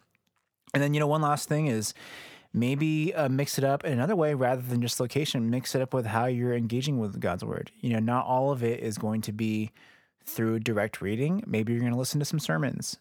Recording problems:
none

